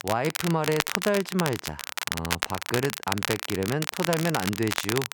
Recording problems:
crackle, like an old record; loud; 2 dB below the speech

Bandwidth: 18 kHz